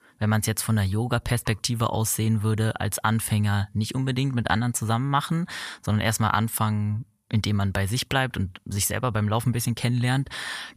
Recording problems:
none

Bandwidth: 14.5 kHz